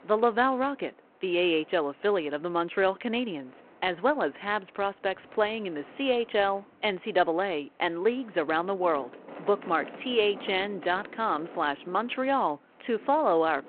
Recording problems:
phone-call audio
wind in the background; faint; throughout; 20 dB below the speech

